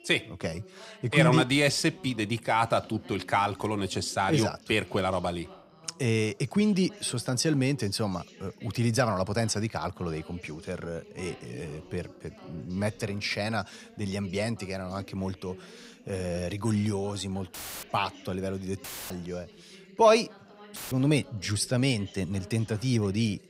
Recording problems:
background chatter; faint; throughout; 2 voices, 20 dB below the speech
audio cutting out; filled with static; at 18 s, at 19 s and at 21 s

